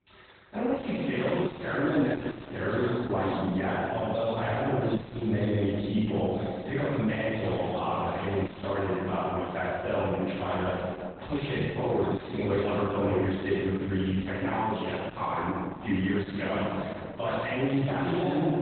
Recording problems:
room echo; strong; dies away in 2 s
off-mic speech; far
garbled, watery; badly; nothing above 4 kHz
distortion; slight; 10 dB below the speech

